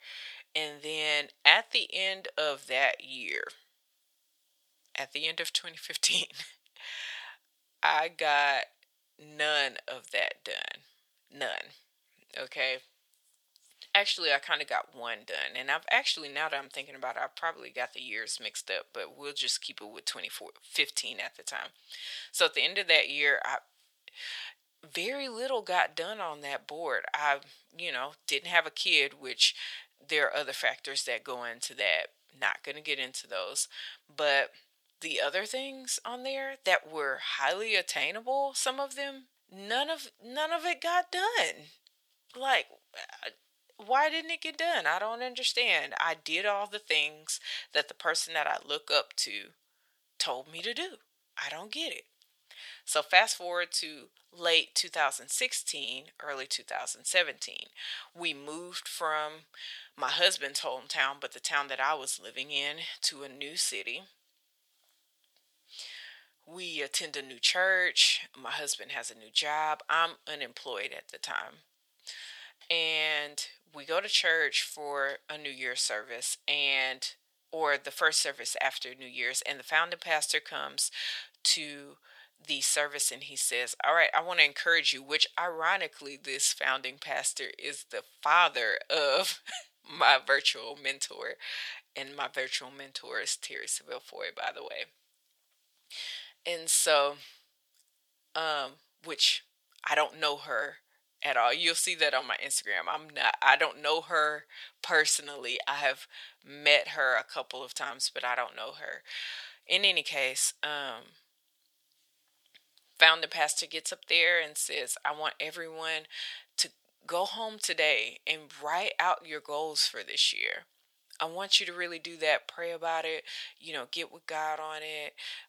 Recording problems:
thin; very; fading below 850 Hz

